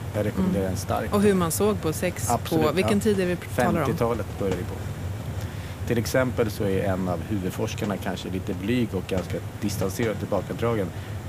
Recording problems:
hiss; loud; throughout; 8 dB below the speech

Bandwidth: 15 kHz